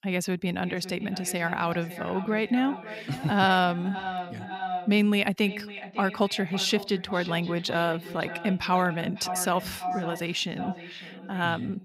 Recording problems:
echo of what is said; strong; throughout; 550 ms later, 10 dB below the speech

